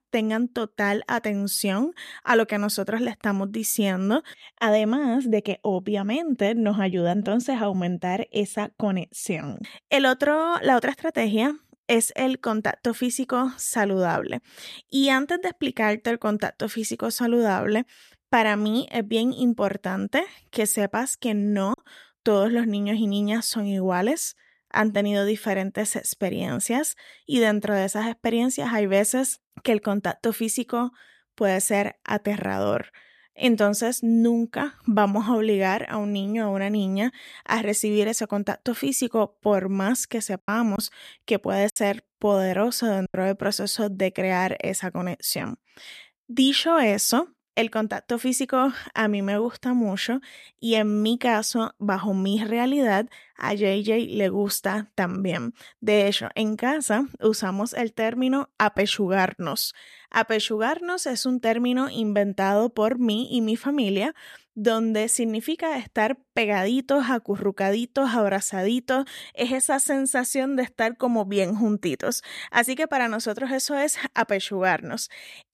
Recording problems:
choppy; occasionally; at 22 s and from 40 to 43 s; 4% of the speech affected

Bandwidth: 14 kHz